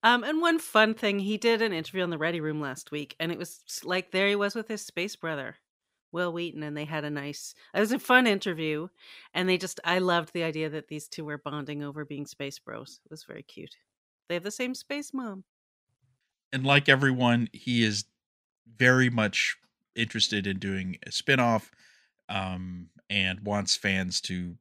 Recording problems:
none

